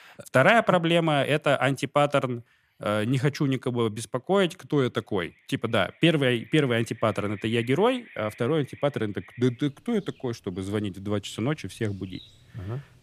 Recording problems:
animal sounds; faint; throughout; 25 dB below the speech

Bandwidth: 15 kHz